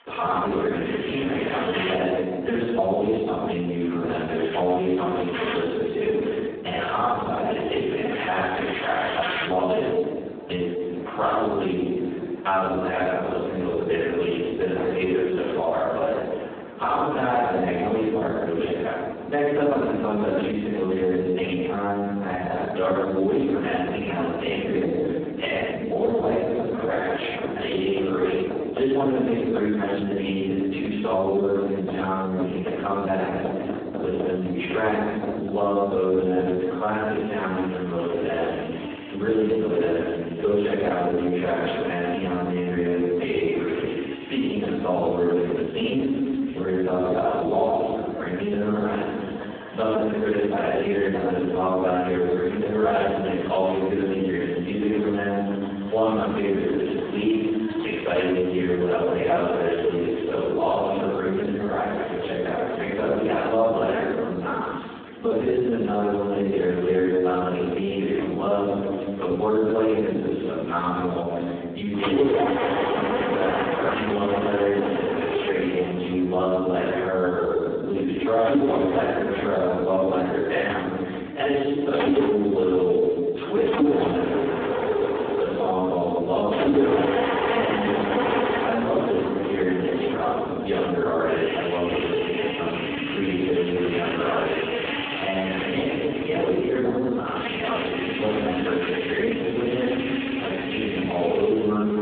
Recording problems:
phone-call audio; poor line
room echo; strong; dies away in 1.1 s
off-mic speech; far
squashed, flat; somewhat
machinery noise; loud; throughout; 5 dB below the speech

